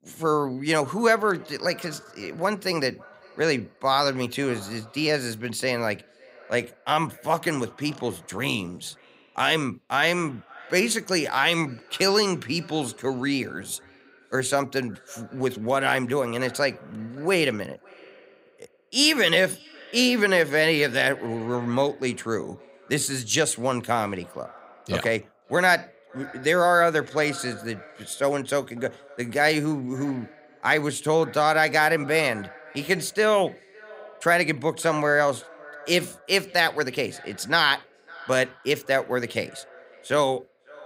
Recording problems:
echo of what is said; faint; throughout; 550 ms later, 25 dB below the speech

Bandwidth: 15.5 kHz